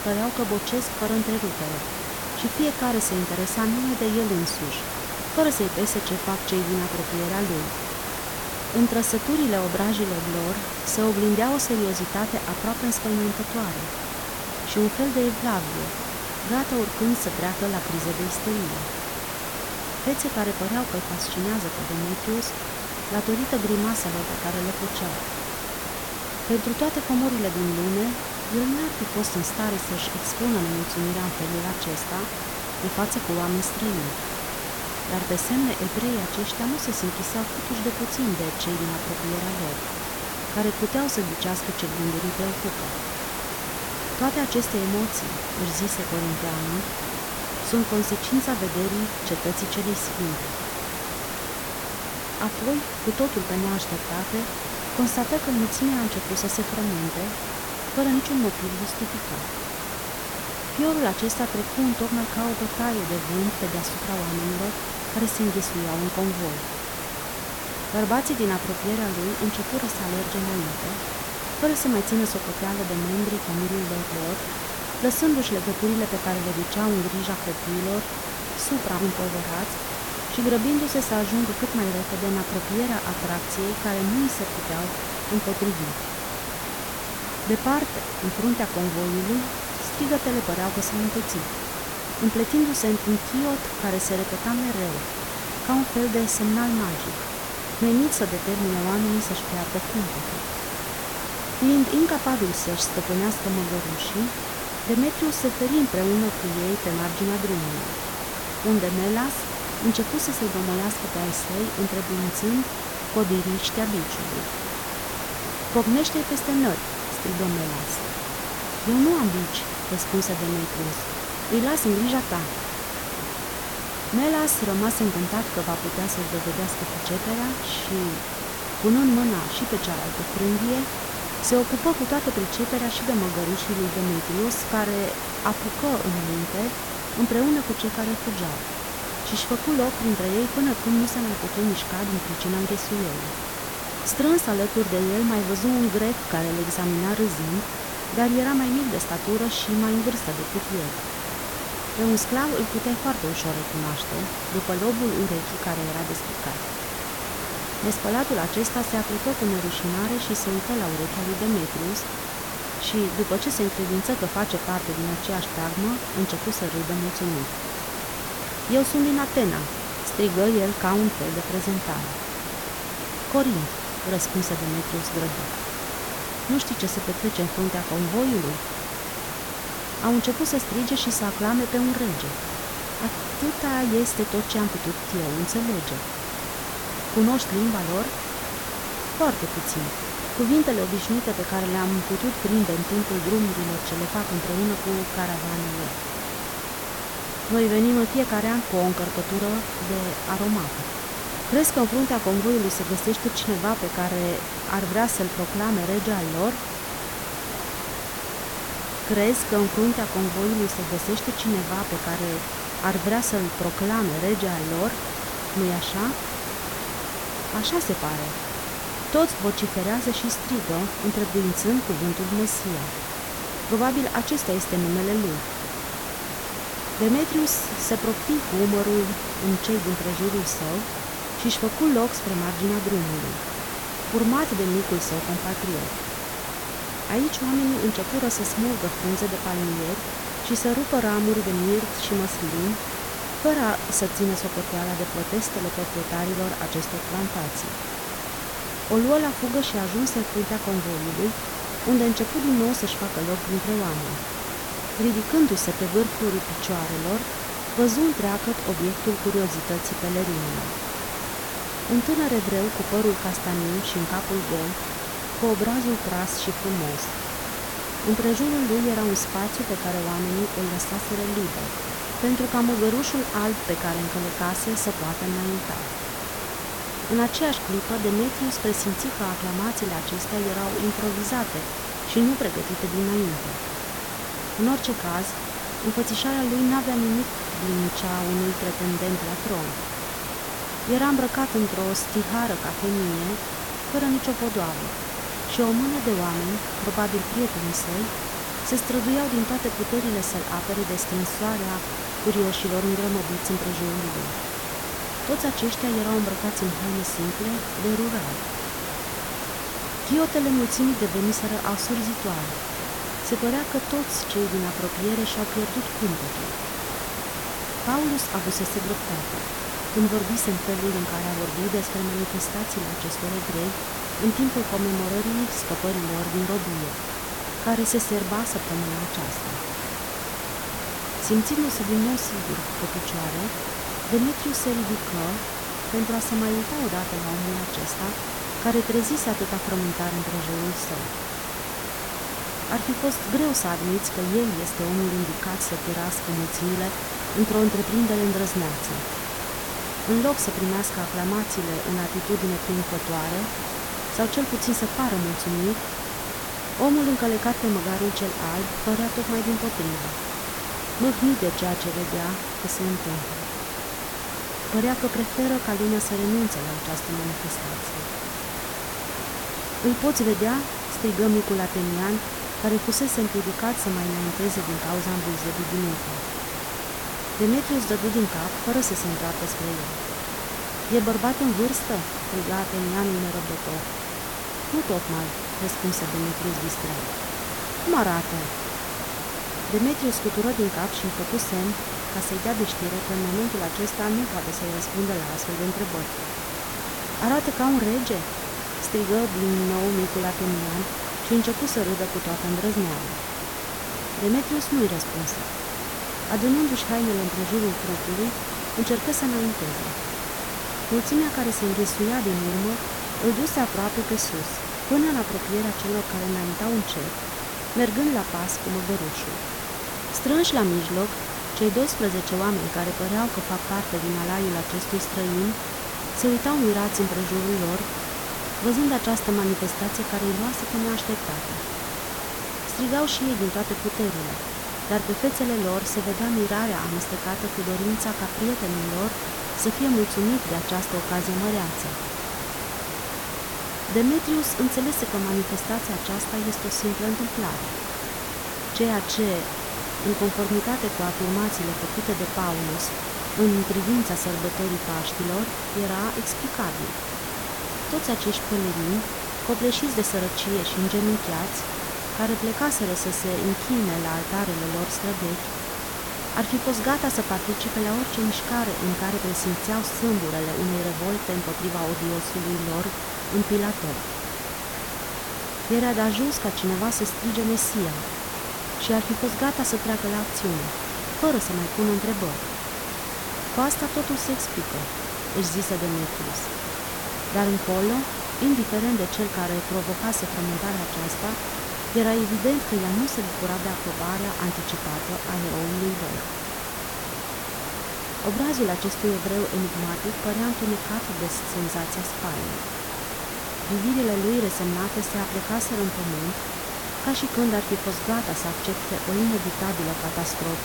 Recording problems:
hiss; loud; throughout; 3 dB below the speech

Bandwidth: 17.5 kHz